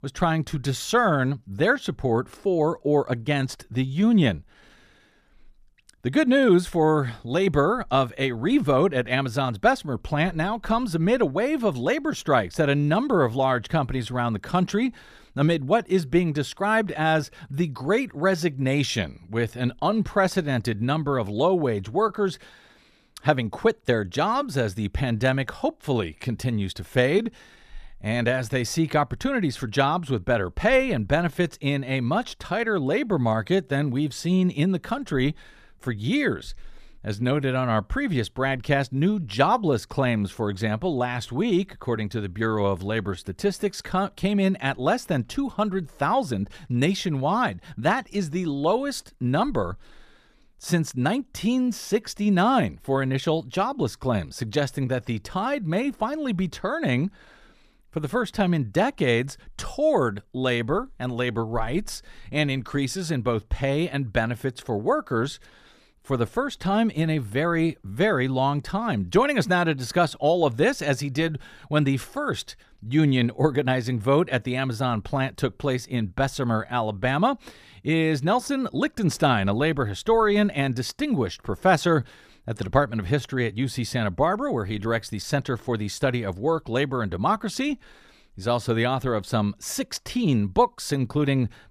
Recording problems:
none

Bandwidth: 14.5 kHz